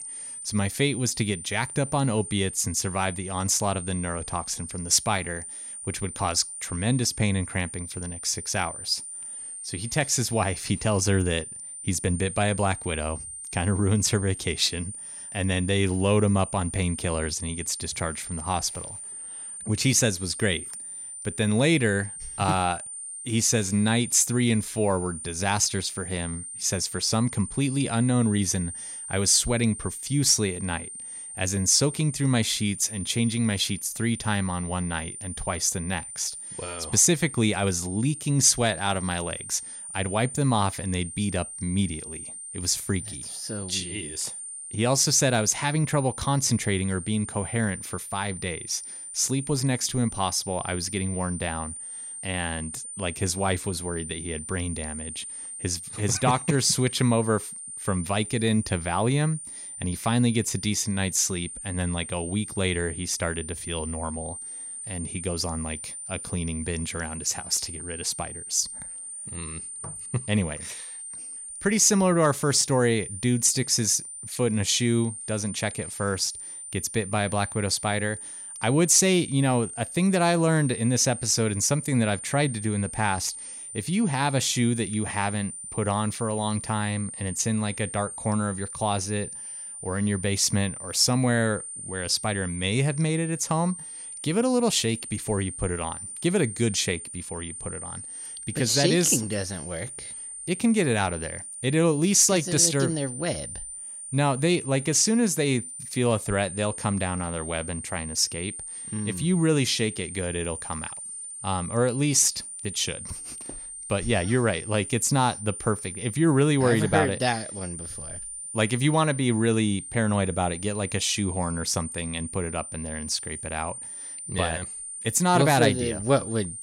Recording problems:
high-pitched whine; loud; throughout; 9 kHz, 10 dB below the speech

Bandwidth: 18.5 kHz